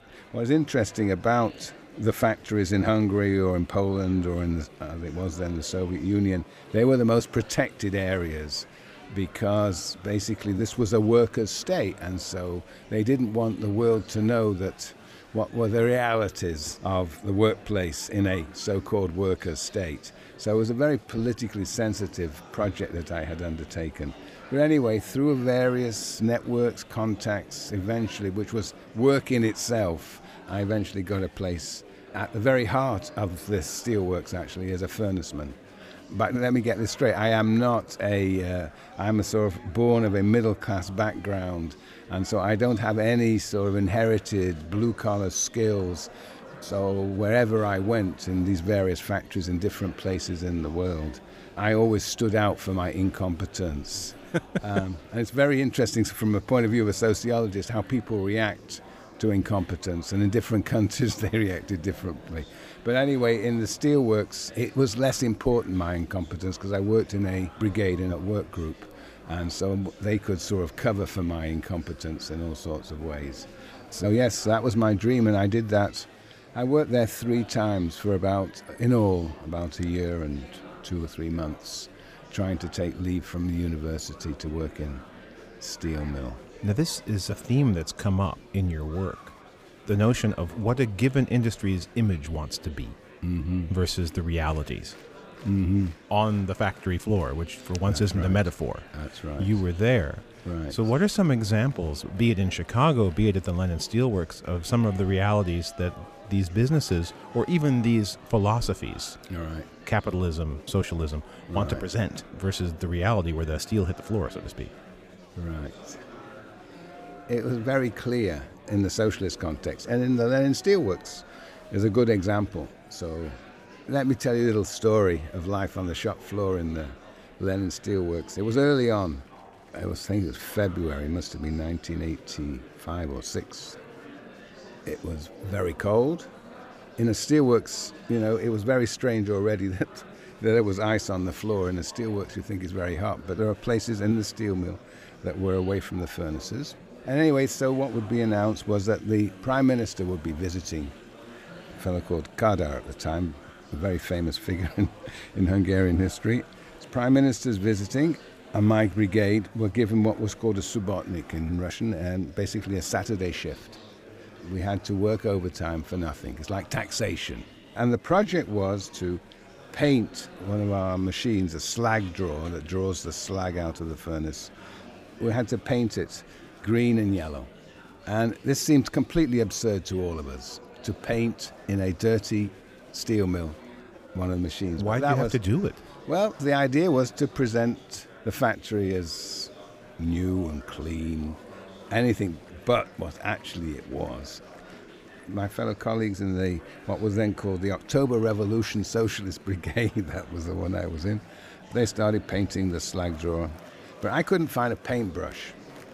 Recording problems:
murmuring crowd; faint; throughout; 20 dB below the speech

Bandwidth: 15 kHz